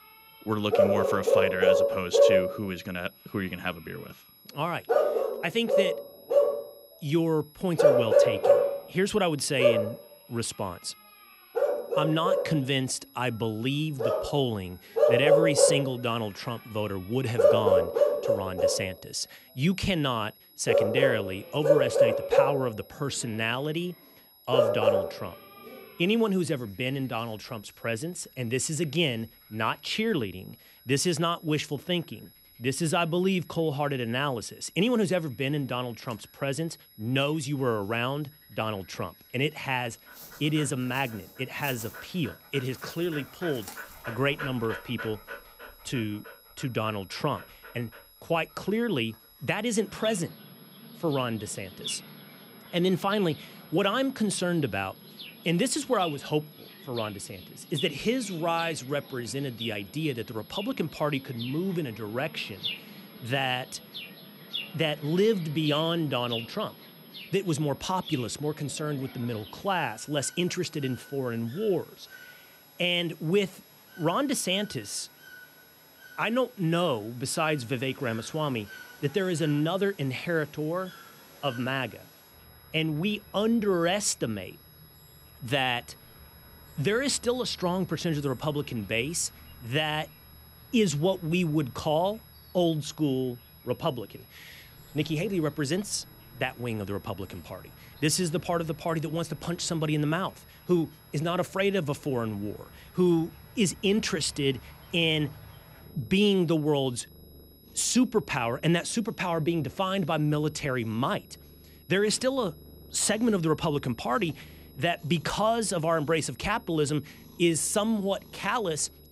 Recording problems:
animal sounds; very loud; throughout; 1 dB above the speech
high-pitched whine; faint; throughout; 11.5 kHz, 25 dB below the speech

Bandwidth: 15.5 kHz